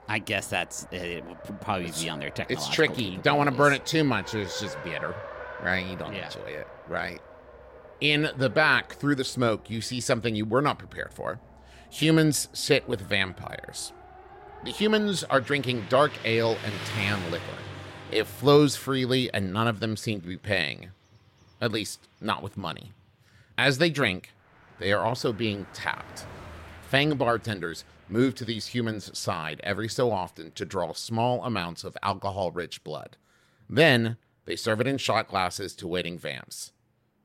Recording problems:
traffic noise; noticeable; throughout; 15 dB below the speech

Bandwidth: 16 kHz